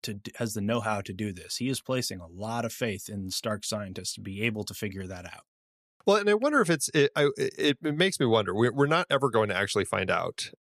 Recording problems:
none

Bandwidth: 14.5 kHz